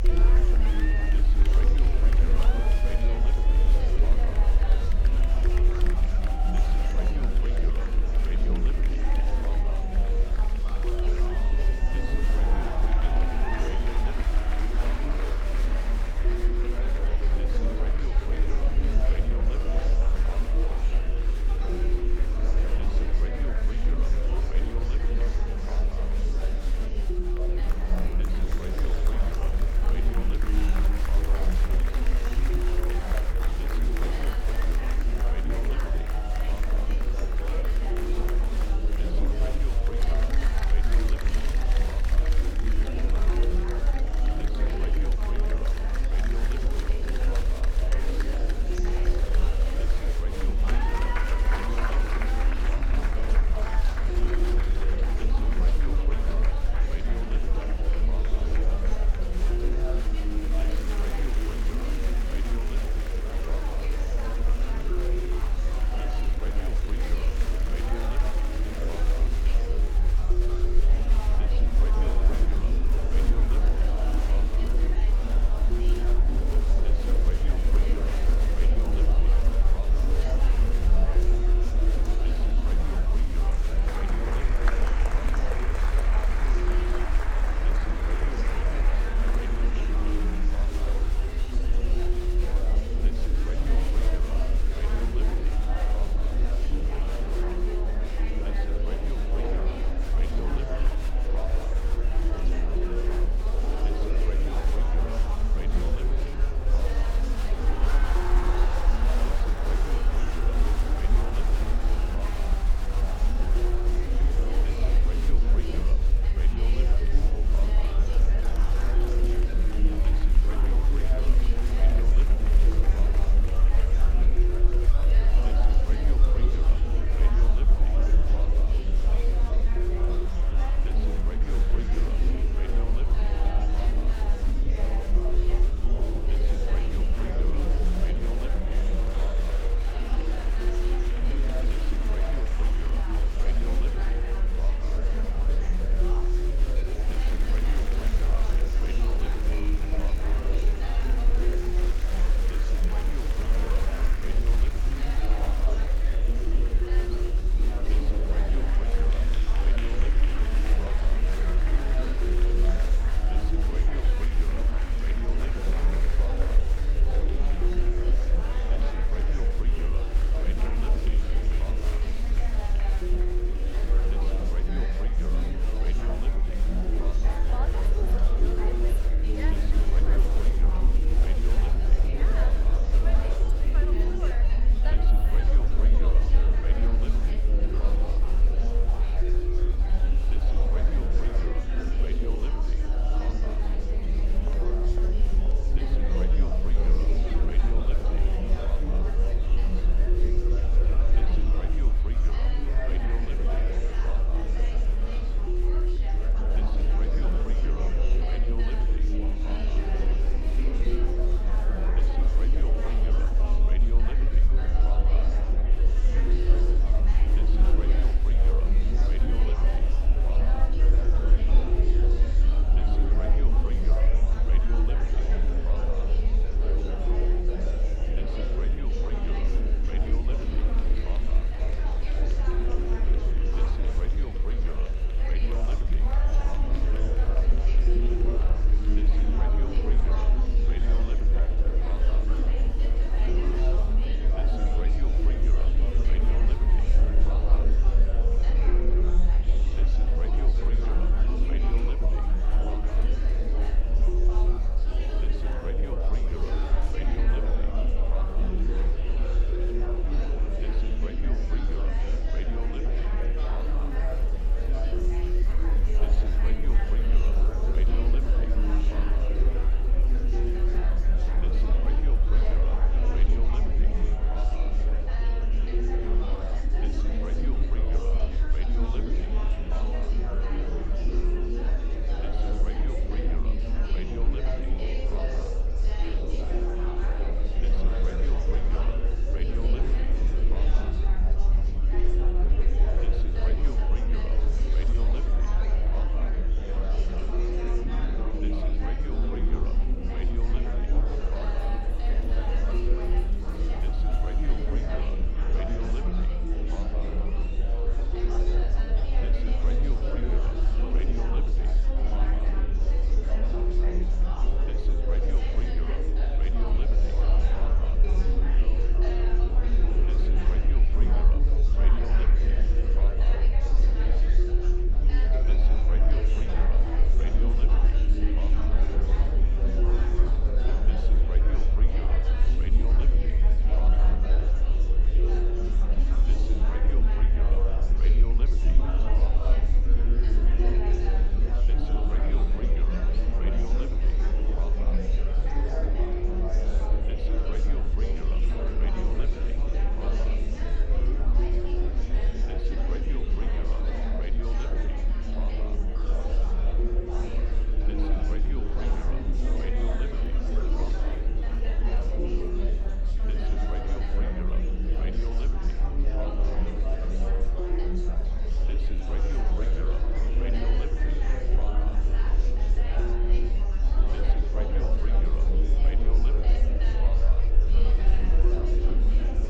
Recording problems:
murmuring crowd; very loud; throughout; 4 dB above the speech
low rumble; loud; throughout; 8 dB below the speech

